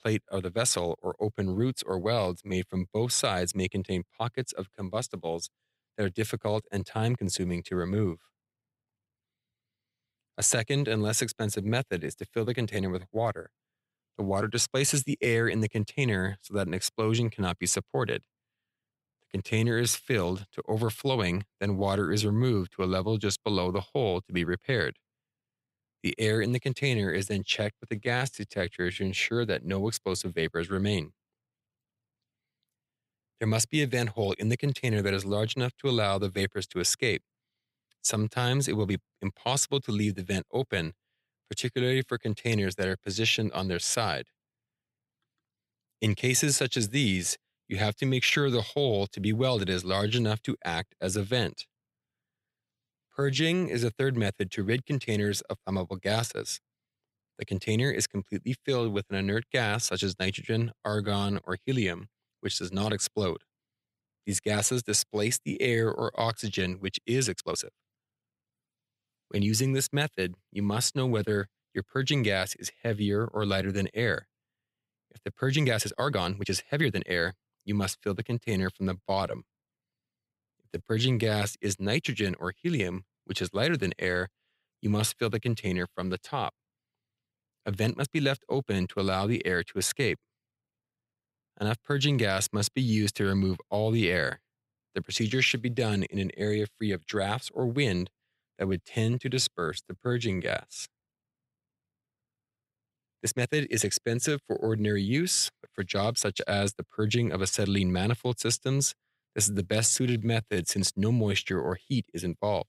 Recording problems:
uneven, jittery; strongly; from 14 s to 1:51

